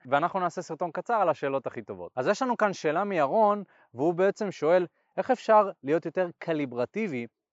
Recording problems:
high frequencies cut off; noticeable; nothing above 8 kHz

